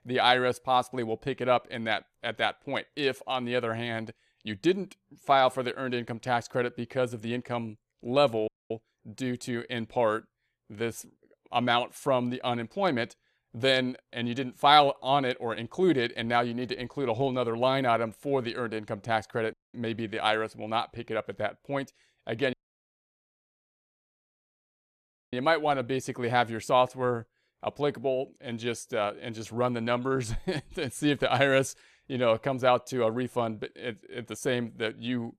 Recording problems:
audio cutting out; at 8.5 s, at 20 s and at 23 s for 3 s

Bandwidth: 14 kHz